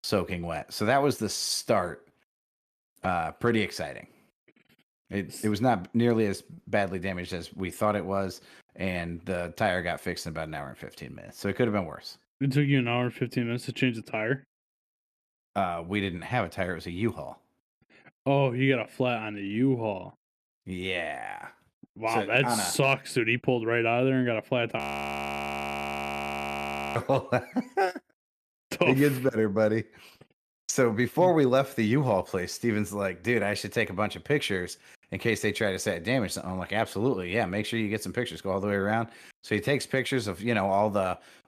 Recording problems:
audio freezing; at 25 s for 2 s

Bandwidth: 14 kHz